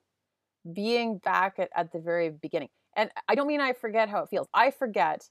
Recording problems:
uneven, jittery; strongly; from 0.5 to 4.5 s

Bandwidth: 14.5 kHz